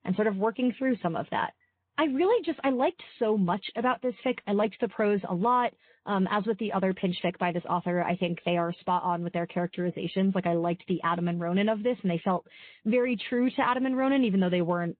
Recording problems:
high frequencies cut off; severe; nothing above 4 kHz
garbled, watery; slightly

